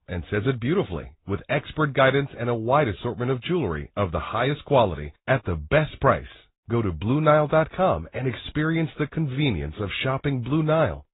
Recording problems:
high frequencies cut off; severe; nothing above 4 kHz
garbled, watery; slightly

